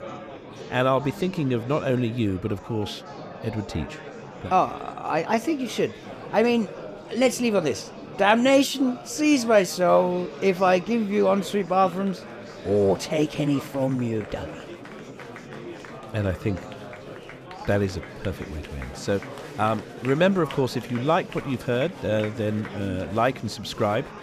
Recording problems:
murmuring crowd; noticeable; throughout; 15 dB below the speech

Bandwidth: 14.5 kHz